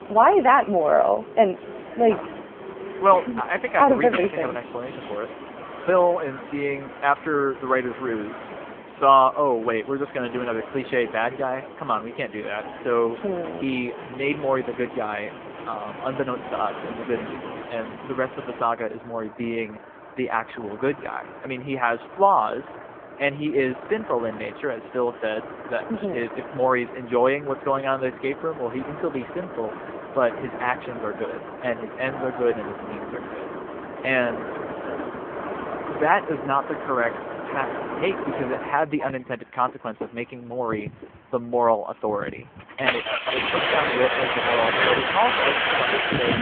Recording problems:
phone-call audio; poor line
traffic noise; loud; throughout; 6 dB below the speech
background music; faint; throughout; 20 dB below the speech

